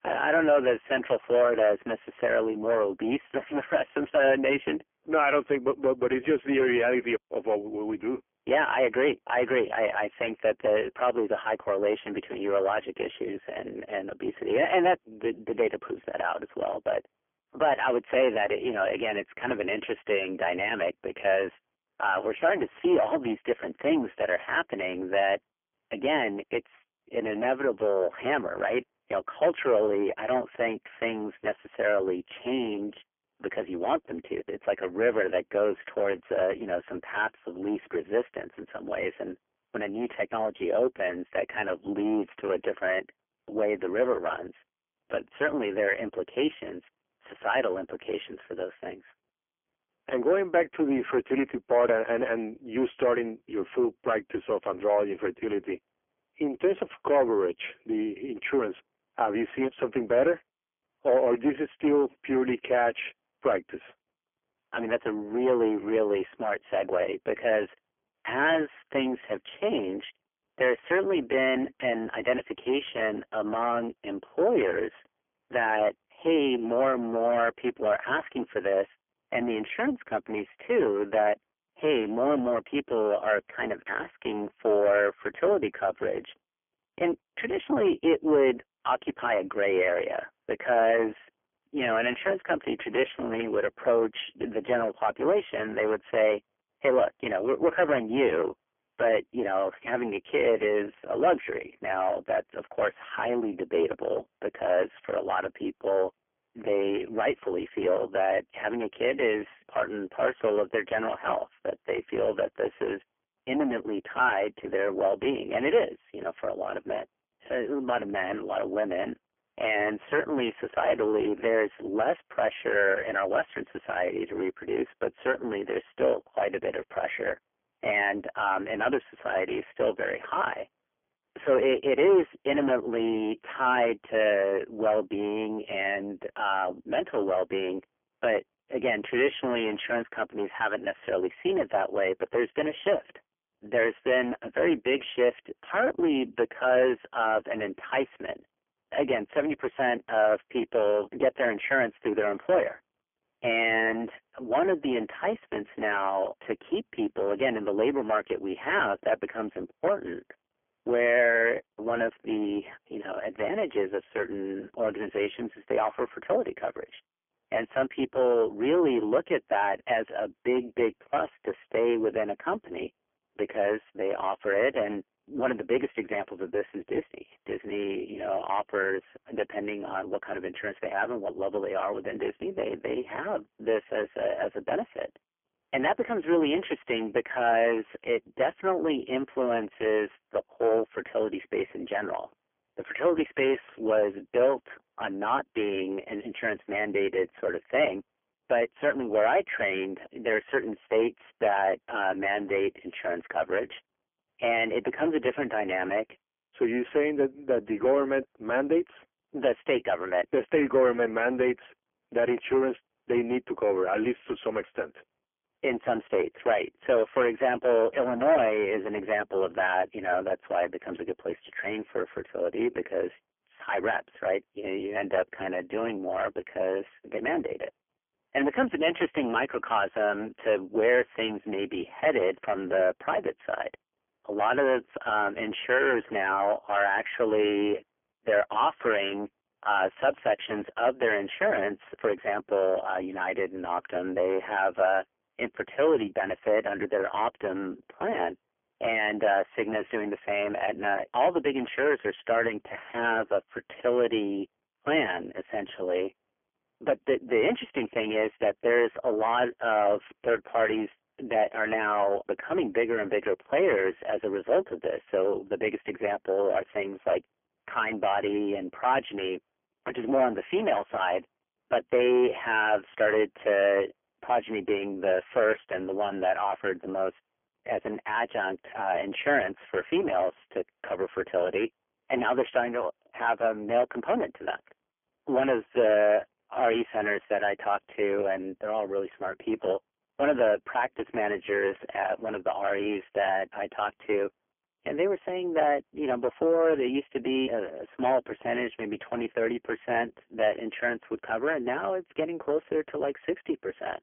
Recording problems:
phone-call audio; poor line; nothing above 3 kHz
distortion; slight; 10 dB below the speech

